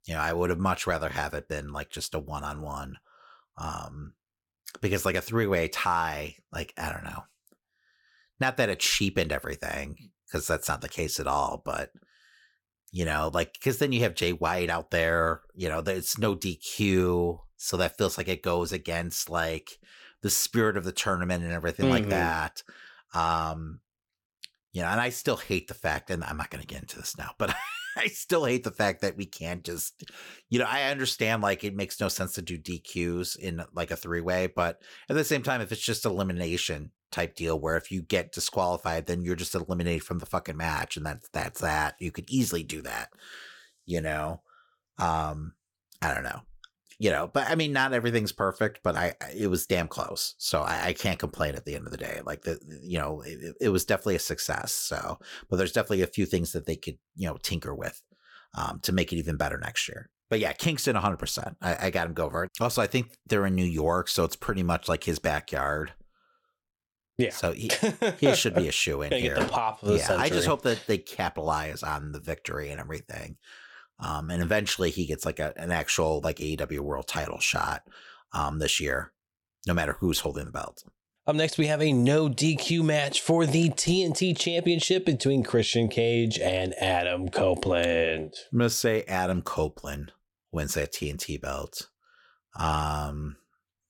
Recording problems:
none

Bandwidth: 17 kHz